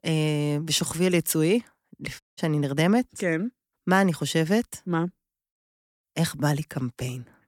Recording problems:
audio cutting out; at 2 s

